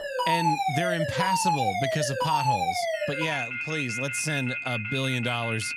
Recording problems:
alarms or sirens; very loud; throughout; 2 dB above the speech

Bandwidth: 14 kHz